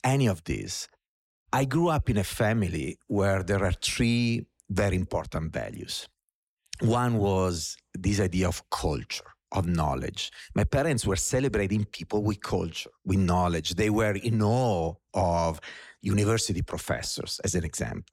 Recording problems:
none

